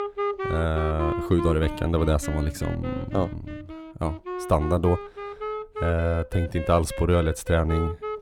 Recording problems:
background music; loud; throughout; 8 dB below the speech

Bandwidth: 17.5 kHz